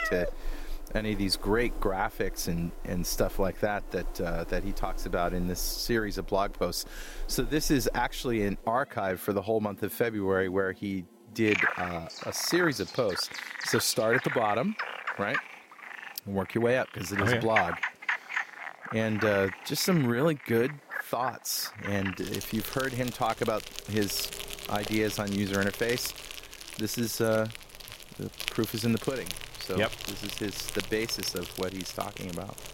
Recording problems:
animal sounds; loud; throughout; 7 dB below the speech

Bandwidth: 16 kHz